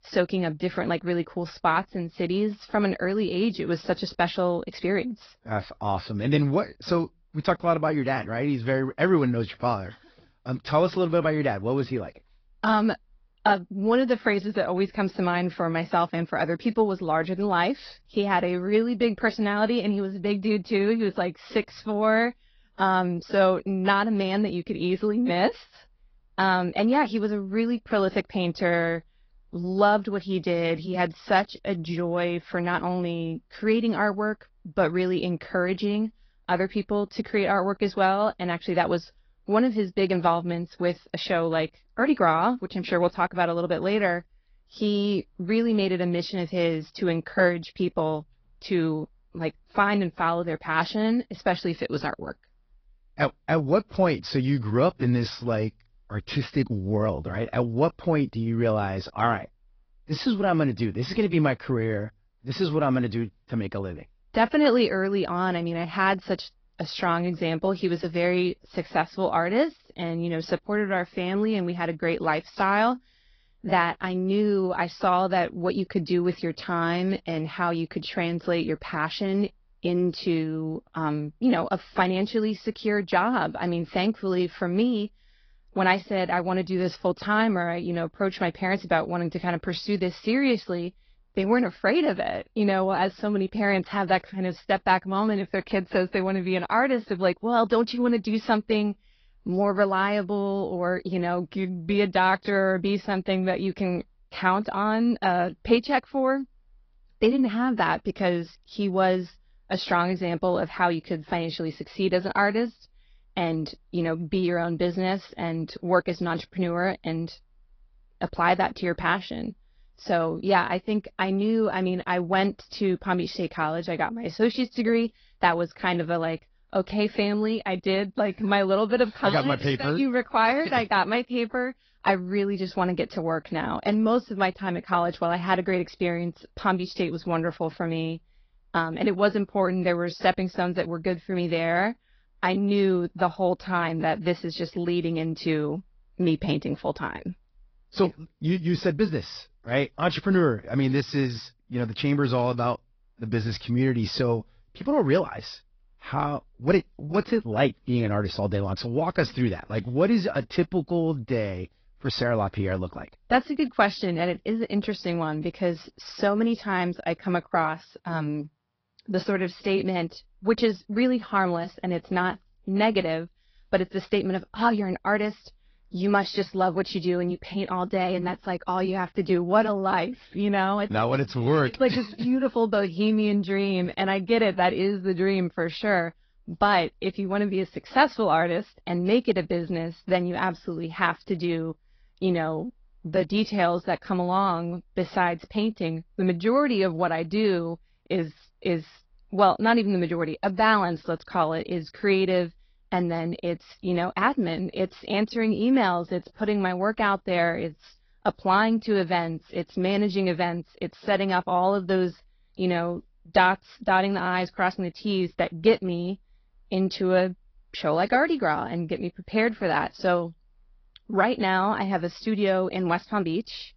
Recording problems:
high frequencies cut off; noticeable; nothing above 5.5 kHz
garbled, watery; slightly

